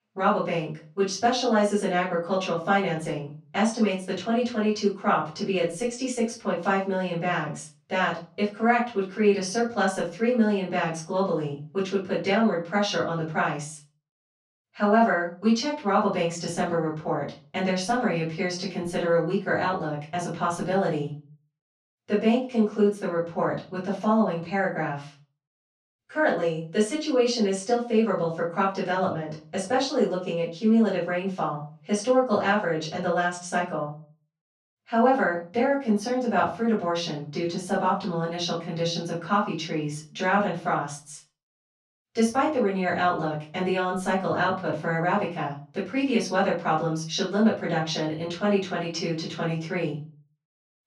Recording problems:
off-mic speech; far
room echo; slight; dies away in 0.3 s

